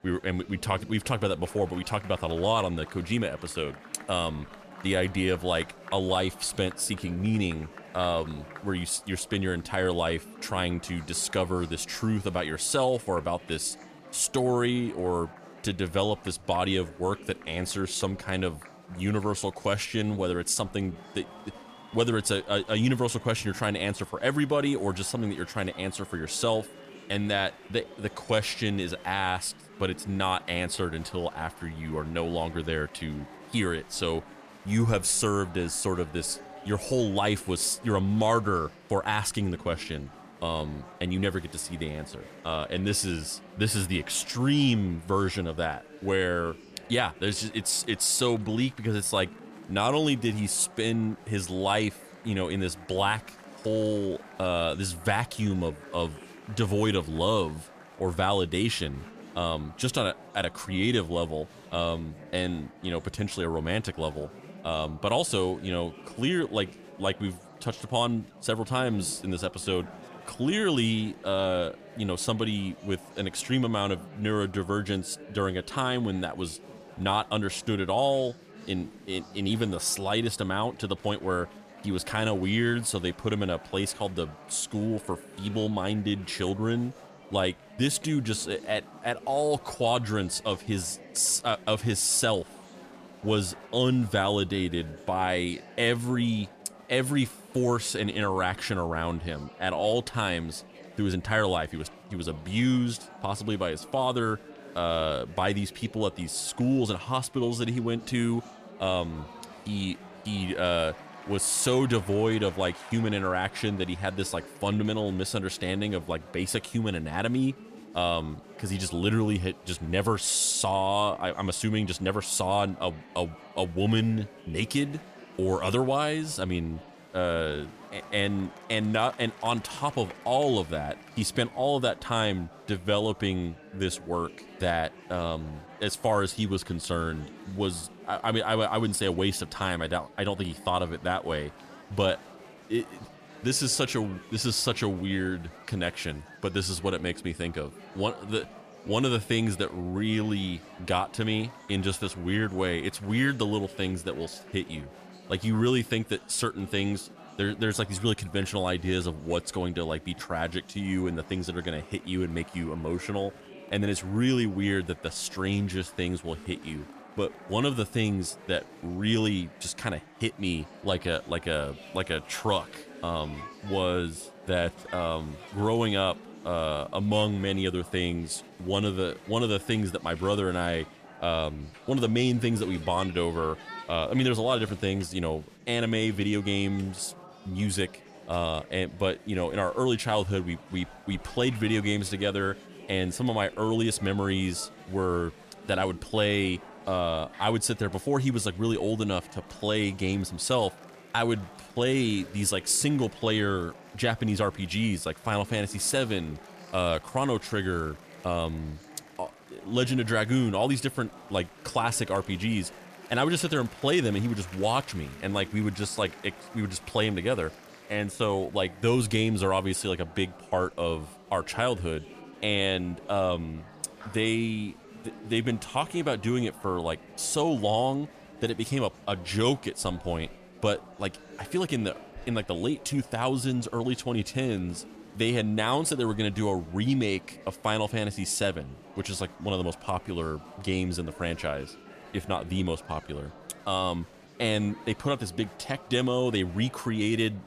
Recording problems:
murmuring crowd; noticeable; throughout; 20 dB below the speech

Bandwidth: 14.5 kHz